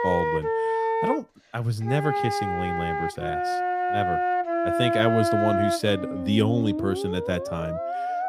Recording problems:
background music; very loud; throughout; 1 dB above the speech

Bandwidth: 15 kHz